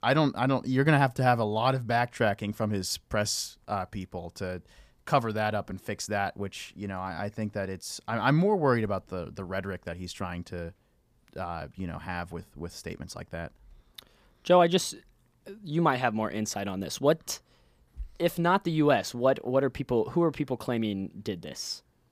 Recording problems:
none

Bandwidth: 15 kHz